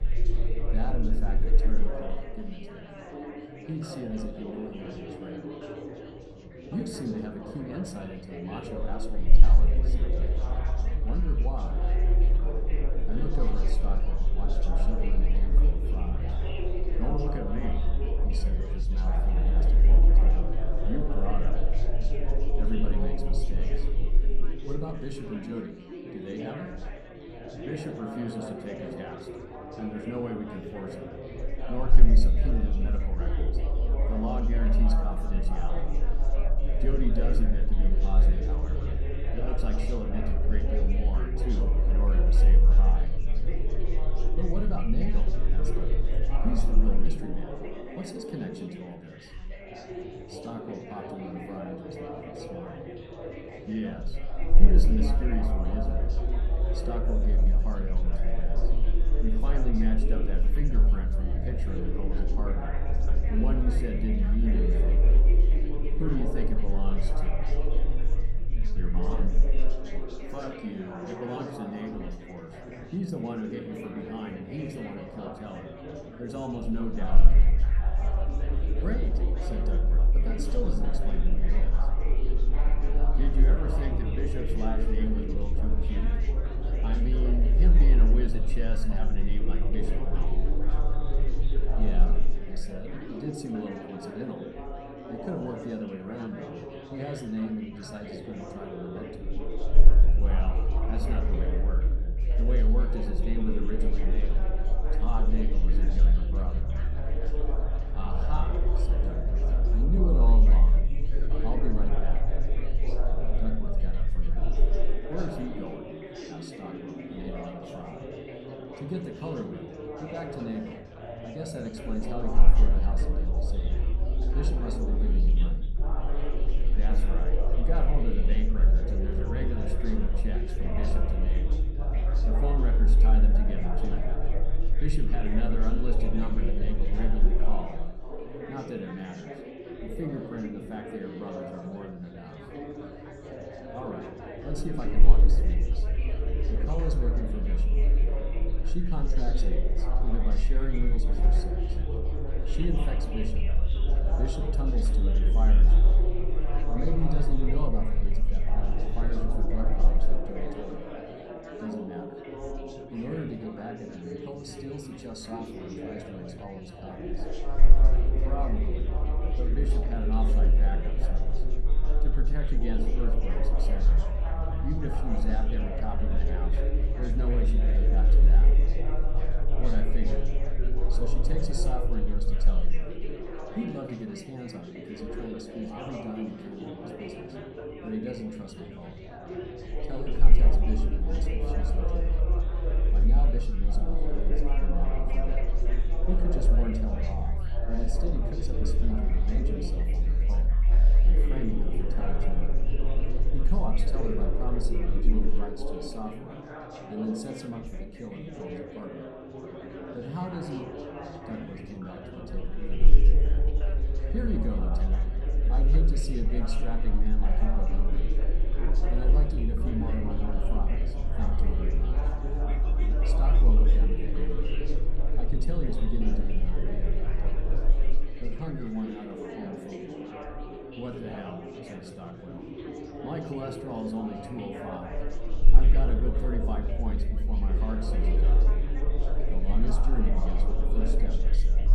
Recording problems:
room echo; slight; dies away in 0.5 s
off-mic speech; somewhat distant
chatter from many people; loud; throughout; 3 dB below the speech
low rumble; noticeable; throughout; 10 dB below the speech

